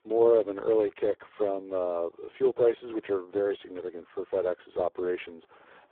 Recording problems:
phone-call audio; poor line; nothing above 8.5 kHz
muffled; very; fading above 2 kHz

